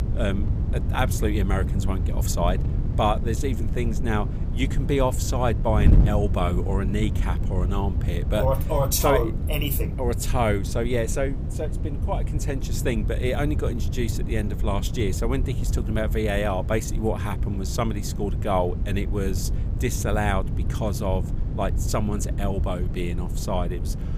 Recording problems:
wind noise on the microphone; occasional gusts; 10 dB below the speech

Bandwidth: 15 kHz